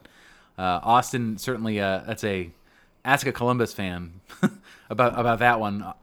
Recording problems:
none

